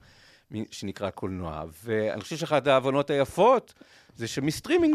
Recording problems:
abrupt cut into speech; at the end

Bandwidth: 14.5 kHz